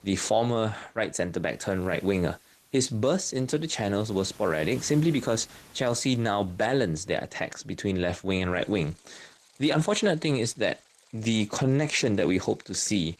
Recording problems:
garbled, watery; slightly; nothing above 13.5 kHz
rain or running water; faint; throughout; 25 dB below the speech

